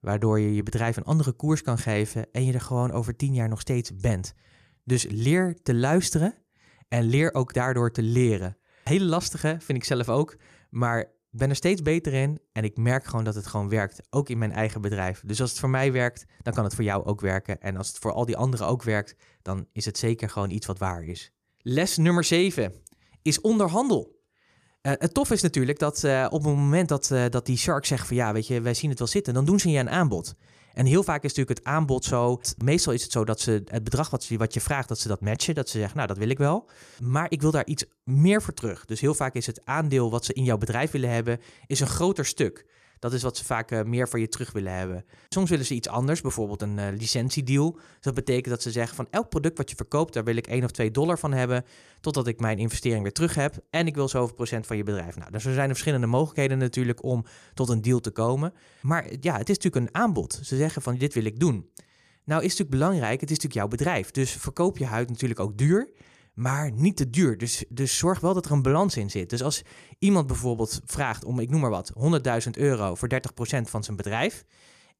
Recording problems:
none

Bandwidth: 14.5 kHz